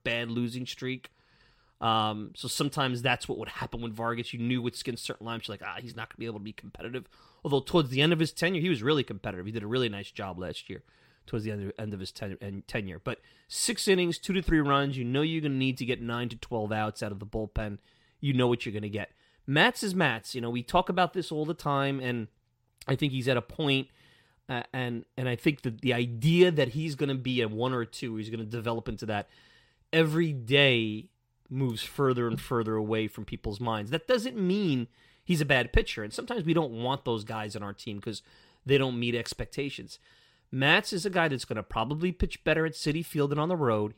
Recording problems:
none

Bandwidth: 16 kHz